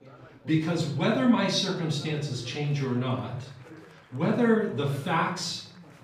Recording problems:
off-mic speech; far
room echo; noticeable; dies away in 0.6 s
chatter from many people; faint; throughout; 20 dB below the speech

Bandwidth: 15 kHz